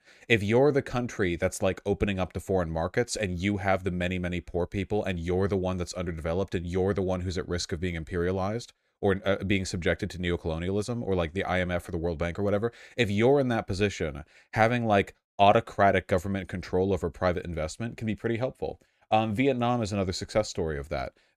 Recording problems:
none

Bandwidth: 14.5 kHz